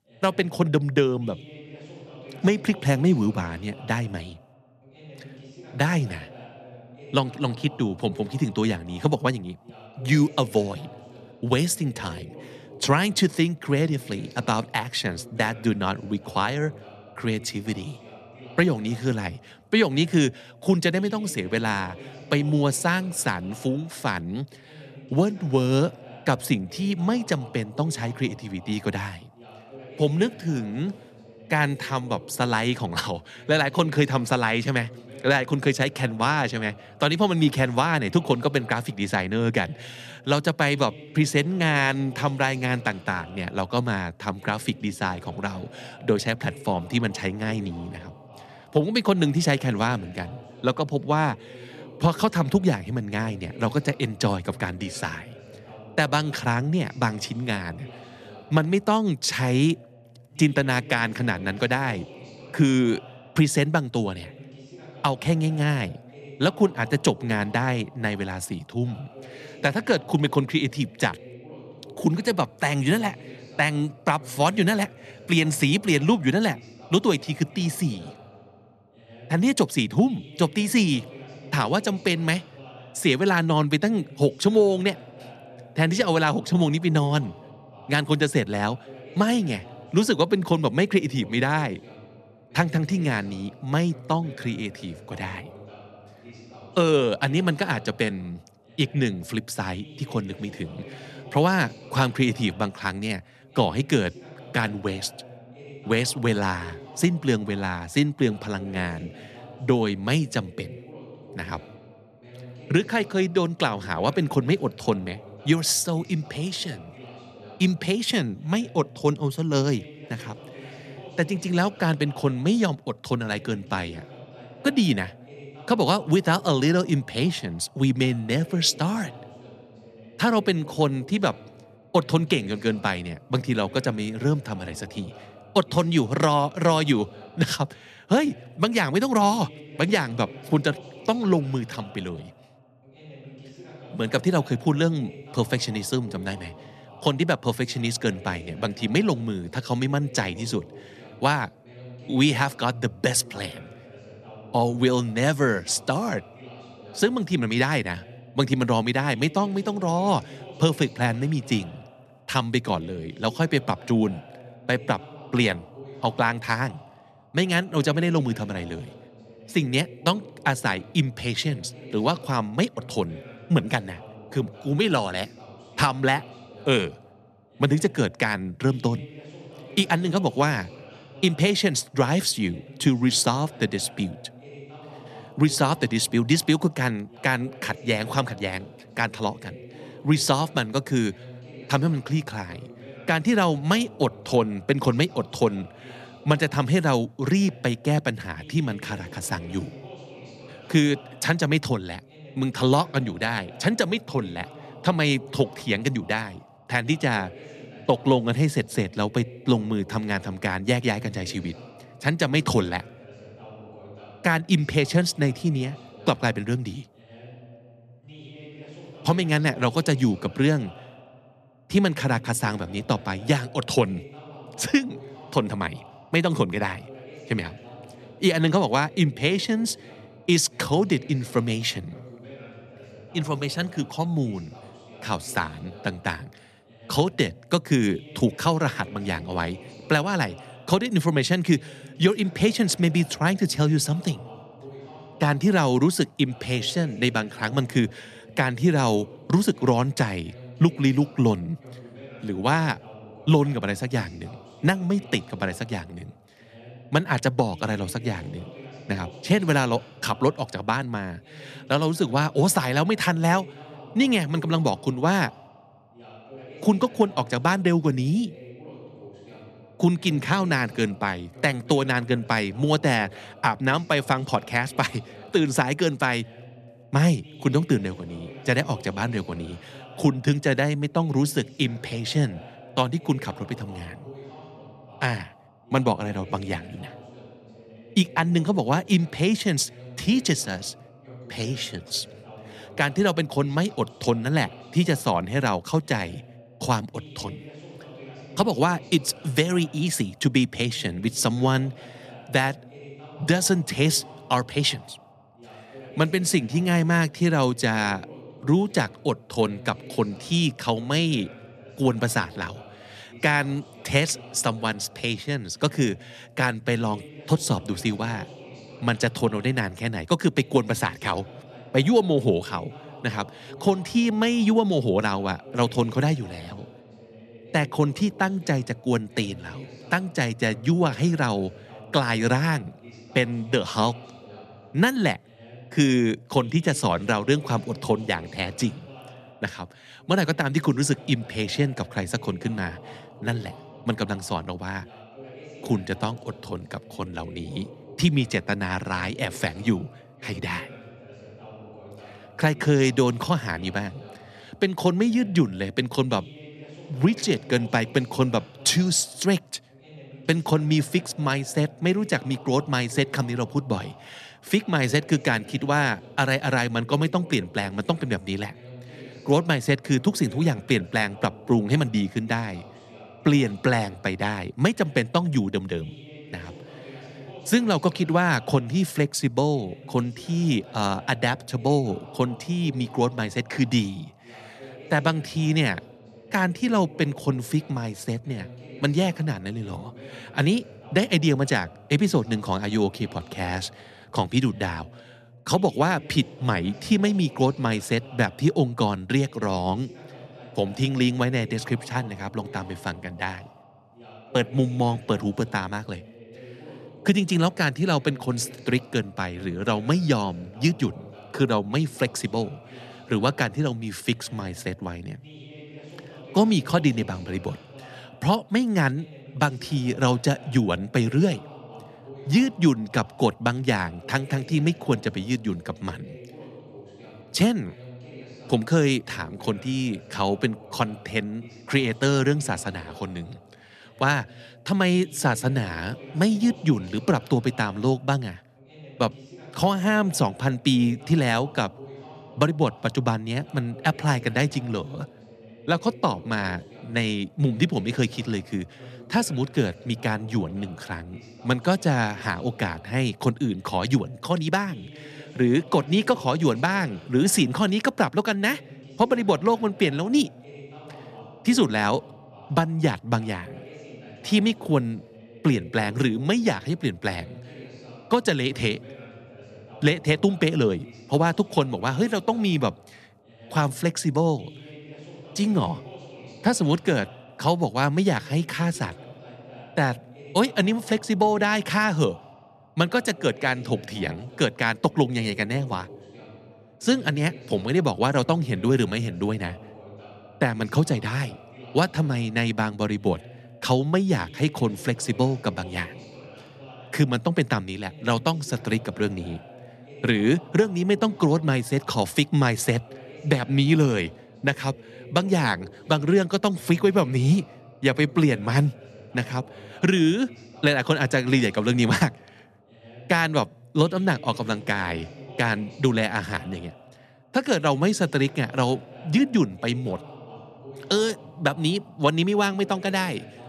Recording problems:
voice in the background; faint; throughout; 20 dB below the speech

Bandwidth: 13.5 kHz